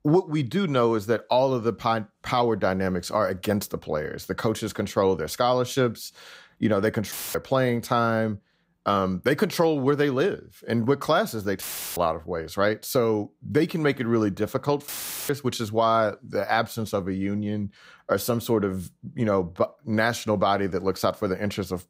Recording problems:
audio cutting out; filled with static; at 7 s, at 12 s and at 15 s

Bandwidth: 15.5 kHz